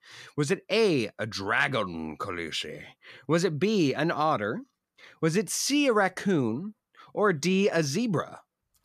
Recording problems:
none

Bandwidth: 14.5 kHz